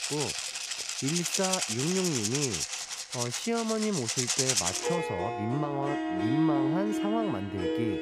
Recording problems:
background music; very loud; throughout; 3 dB above the speech

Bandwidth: 15.5 kHz